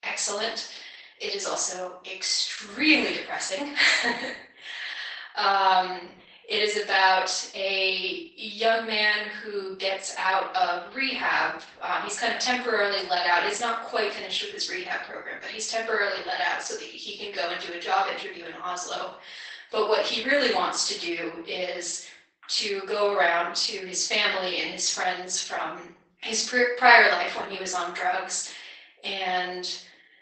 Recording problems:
off-mic speech; far
garbled, watery; badly; nothing above 8 kHz
thin; very; fading below 500 Hz
room echo; noticeable; dies away in 0.5 s

